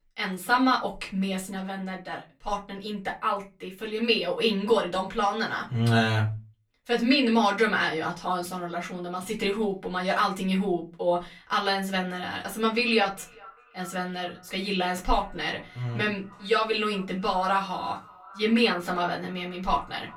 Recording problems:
off-mic speech; far
echo of what is said; faint; from 13 s on; 400 ms later, 25 dB below the speech
room echo; very slight; dies away in 0.2 s

